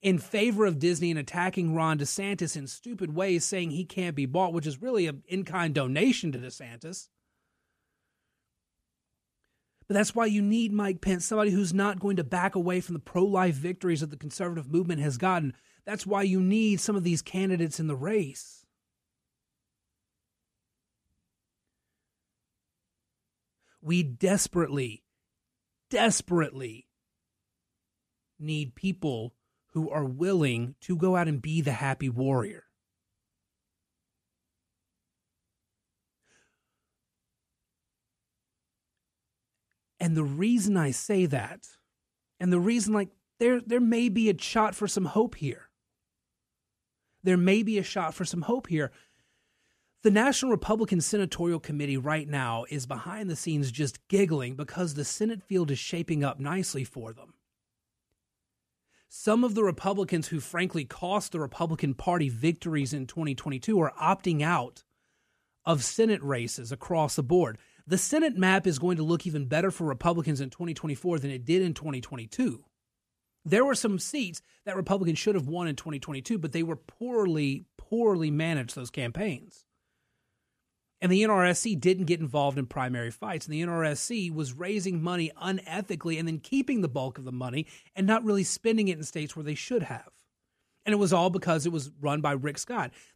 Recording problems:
none

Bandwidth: 14.5 kHz